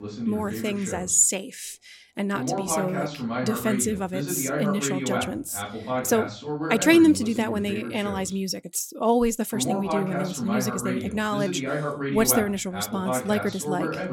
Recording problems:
voice in the background; loud; throughout; 5 dB below the speech

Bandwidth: 16.5 kHz